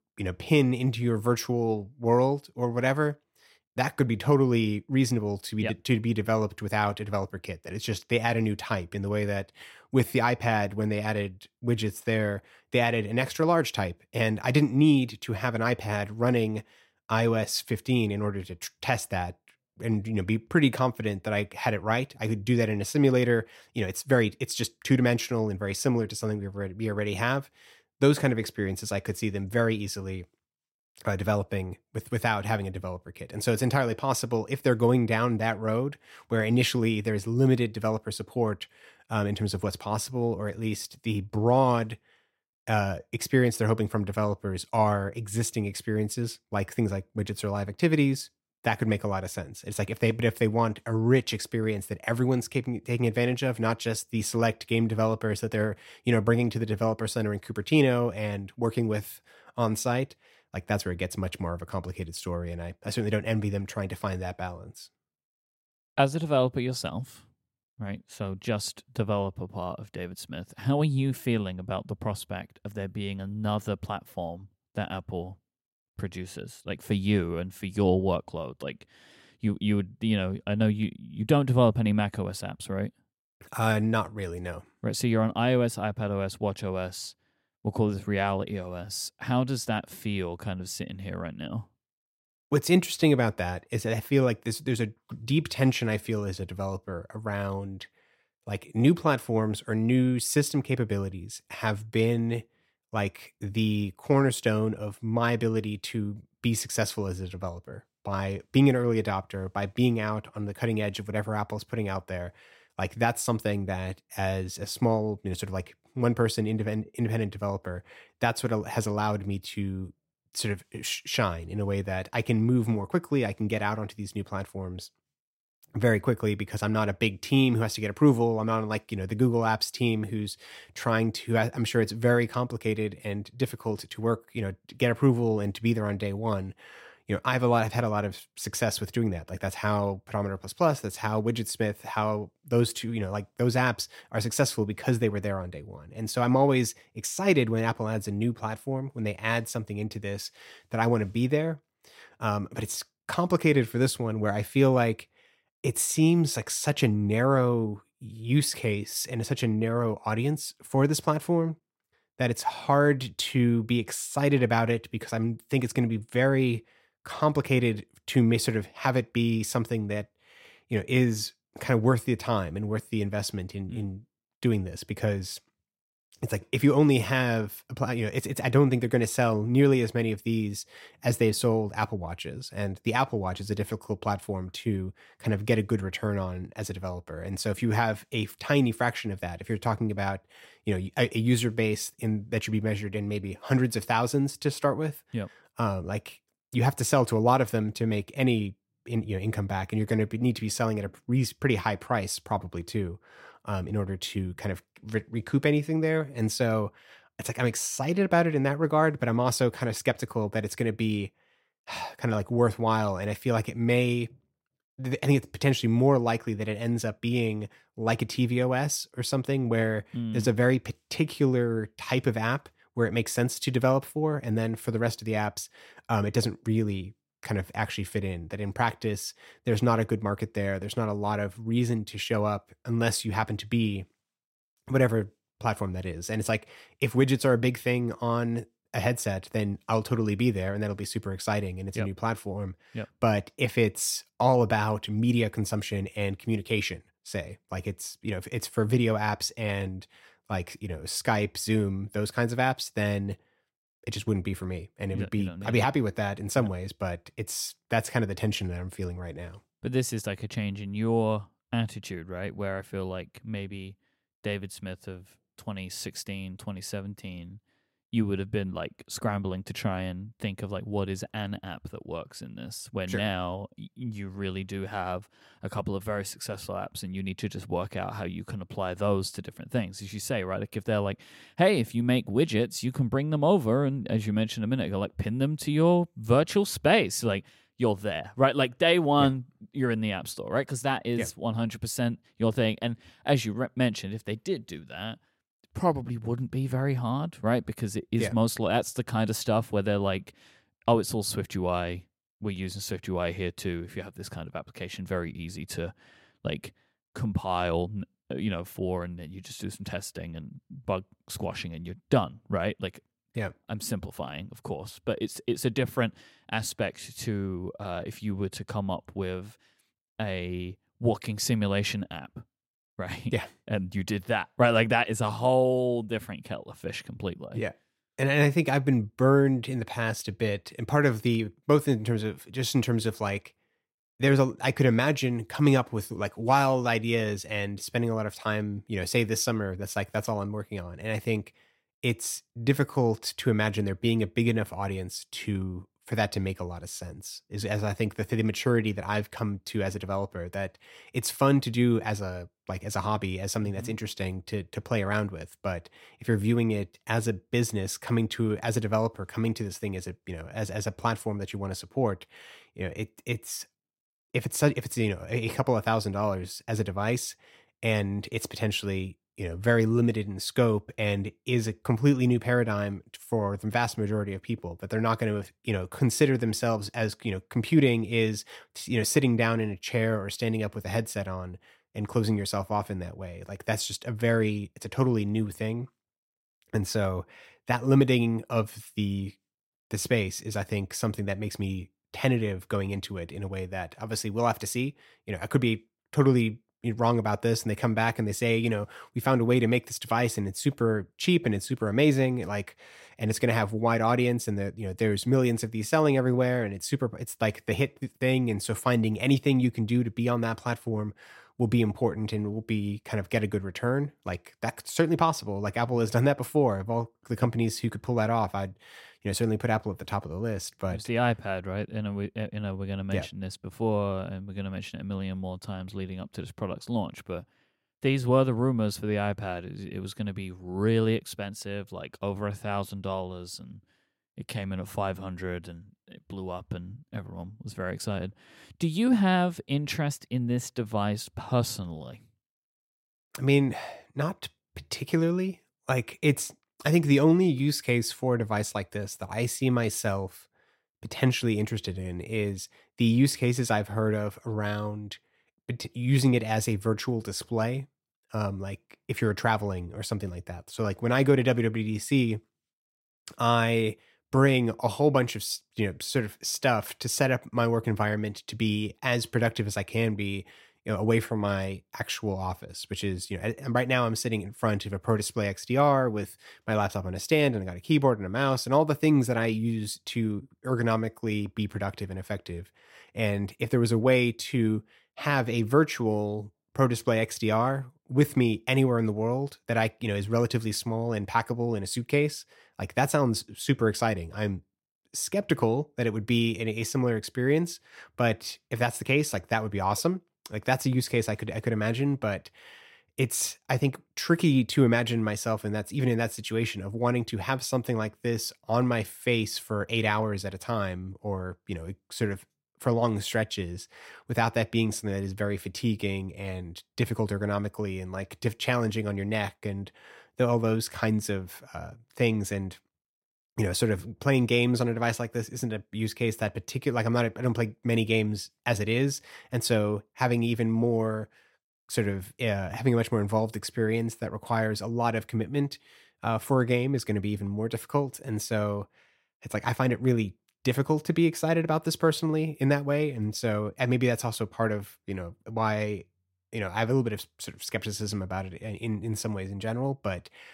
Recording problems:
none

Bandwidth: 16 kHz